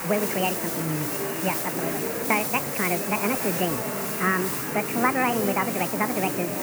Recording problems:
high frequencies cut off; severe; nothing above 3 kHz
wrong speed and pitch; too fast and too high; 1.5 times normal speed
murmuring crowd; loud; throughout; 4 dB below the speech
hiss; loud; throughout; 2 dB below the speech

